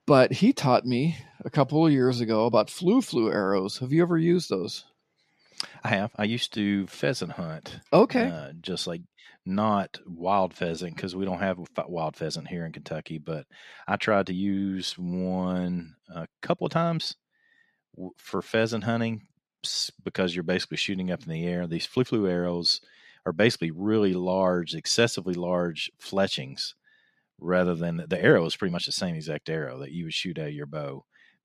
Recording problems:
uneven, jittery; strongly; from 1 to 29 s

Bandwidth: 14 kHz